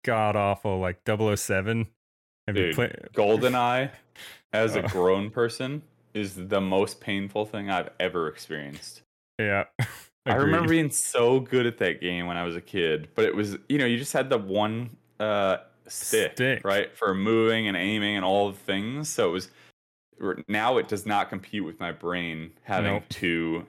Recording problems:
none

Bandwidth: 16.5 kHz